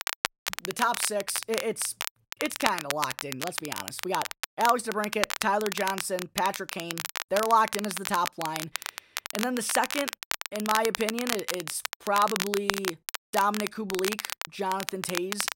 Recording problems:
crackle, like an old record; loud; 4 dB below the speech

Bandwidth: 16 kHz